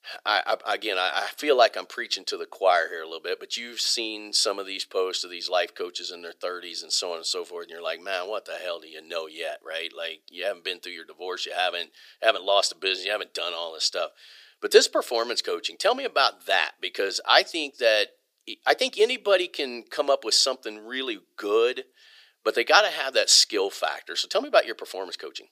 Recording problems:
thin; very; fading below 400 Hz

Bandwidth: 15 kHz